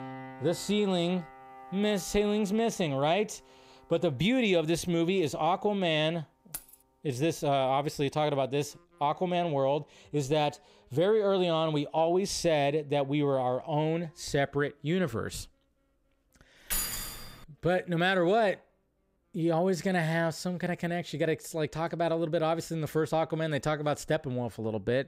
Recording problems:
background music; faint; throughout; 25 dB below the speech
jangling keys; faint; at 6.5 s; peak 15 dB below the speech
jangling keys; noticeable; at 17 s; peak 1 dB below the speech

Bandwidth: 15.5 kHz